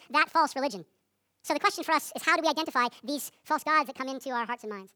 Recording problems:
wrong speed and pitch; too fast and too high; 1.6 times normal speed

